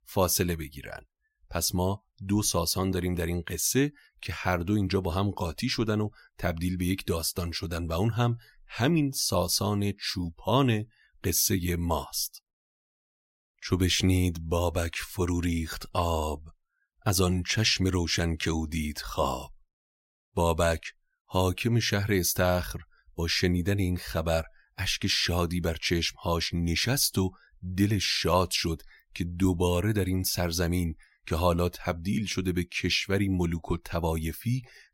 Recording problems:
none

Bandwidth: 16 kHz